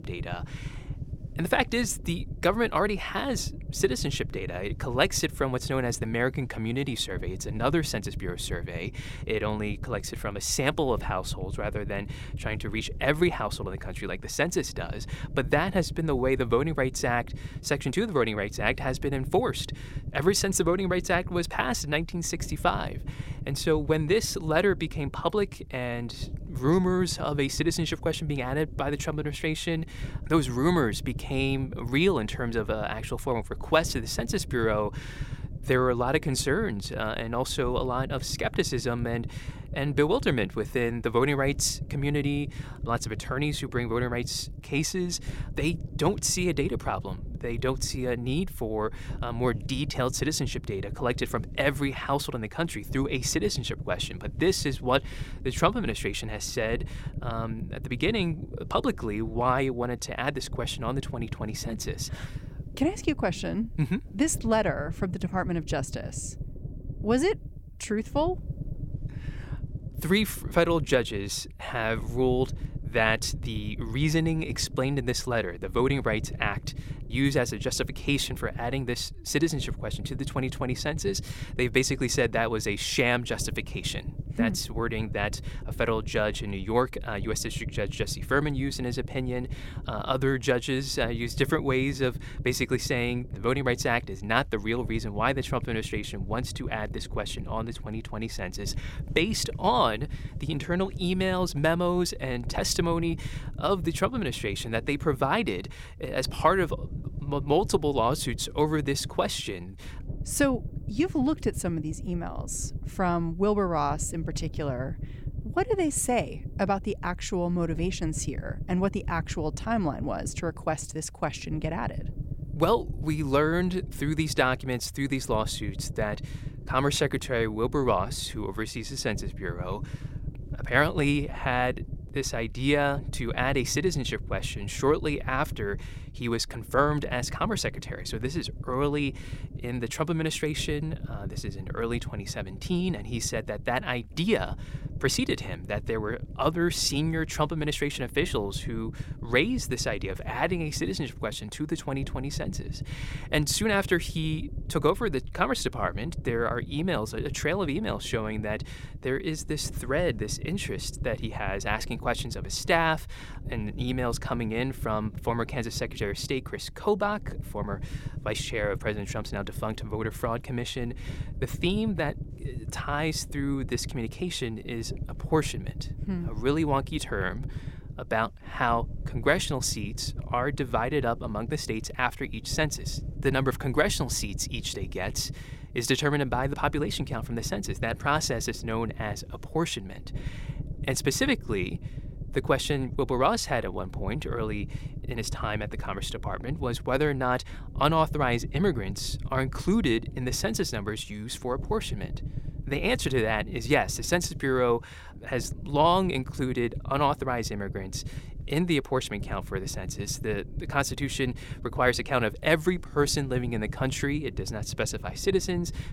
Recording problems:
low rumble; faint; throughout; 20 dB below the speech

